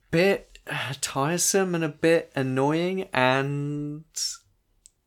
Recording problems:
none

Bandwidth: 18 kHz